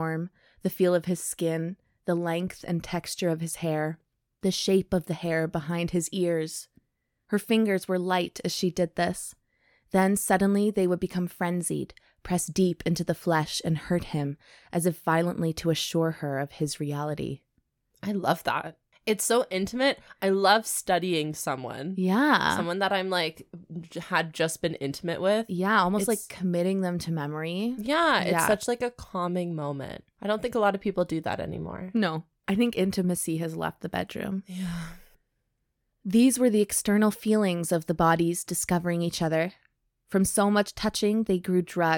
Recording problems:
abrupt cut into speech; at the start and the end

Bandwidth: 17 kHz